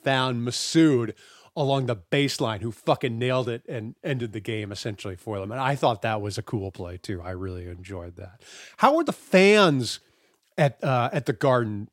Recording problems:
none

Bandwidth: 16 kHz